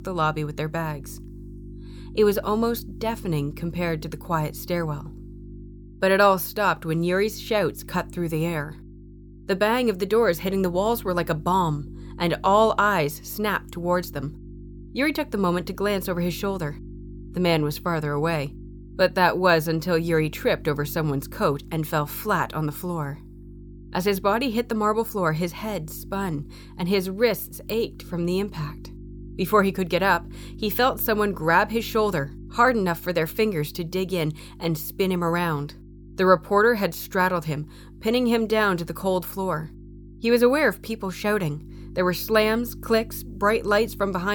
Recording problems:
electrical hum; faint; throughout; 50 Hz, 25 dB below the speech
abrupt cut into speech; at the end

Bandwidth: 18.5 kHz